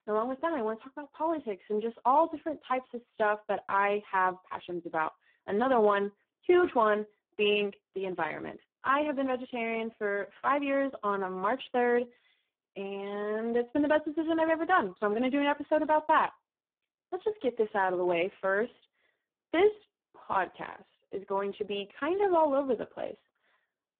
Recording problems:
phone-call audio; poor line

